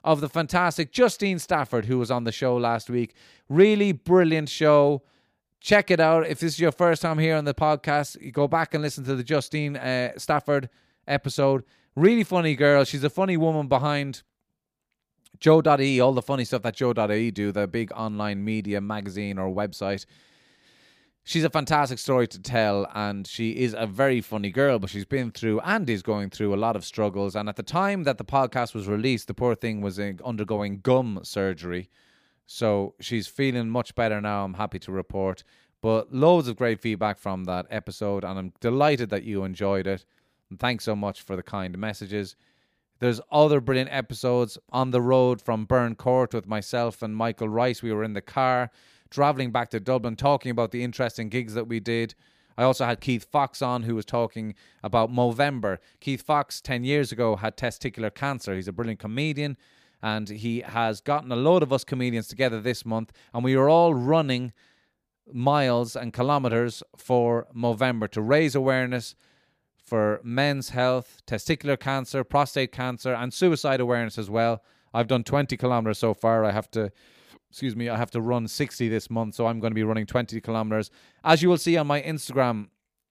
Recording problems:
none

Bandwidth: 15 kHz